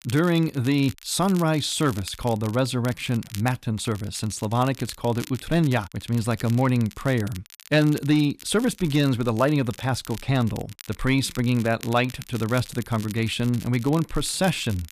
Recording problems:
crackle, like an old record; noticeable; 20 dB below the speech

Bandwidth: 14.5 kHz